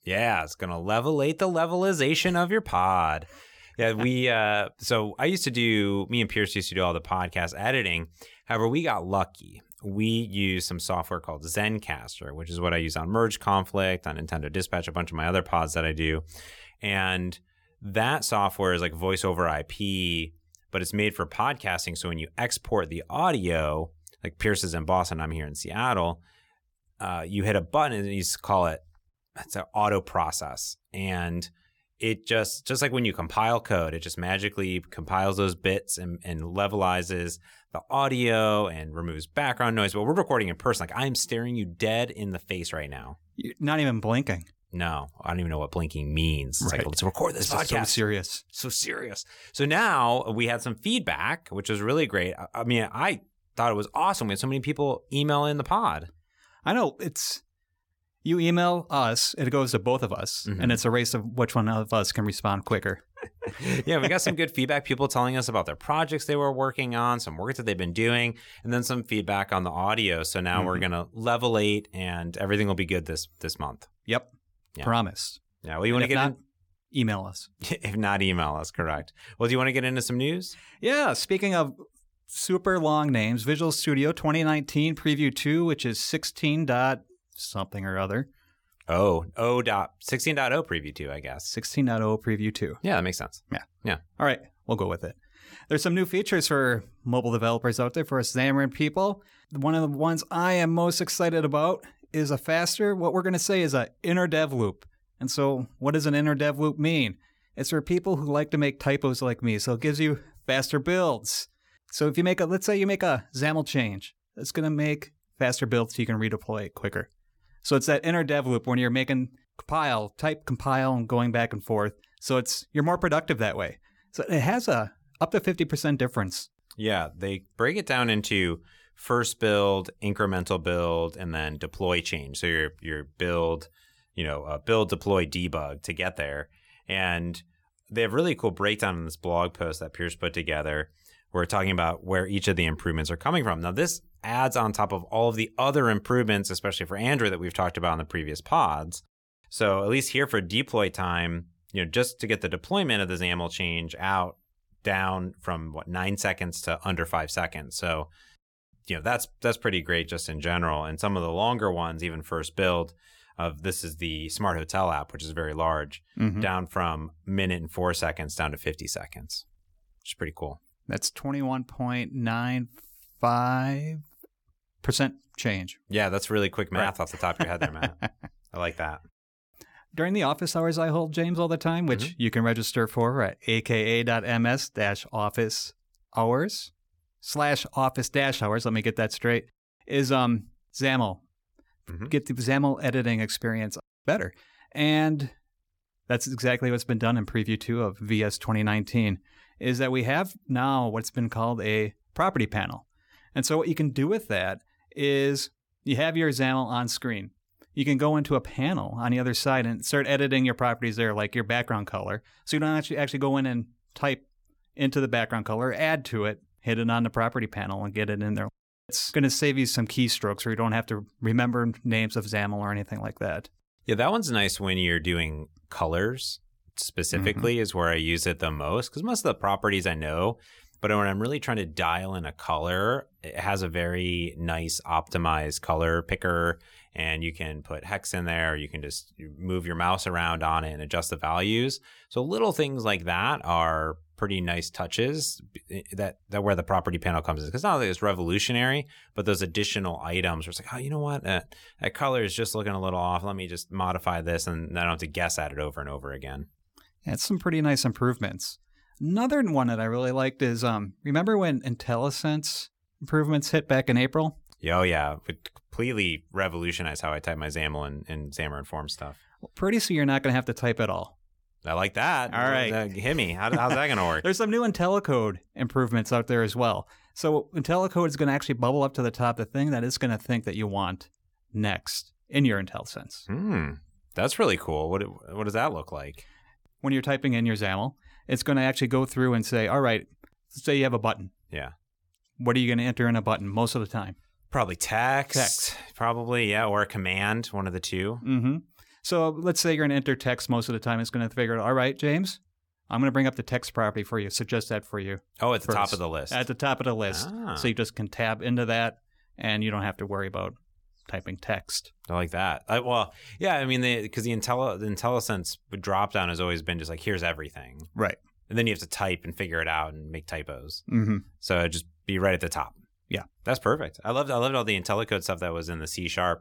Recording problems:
none

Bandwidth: 18 kHz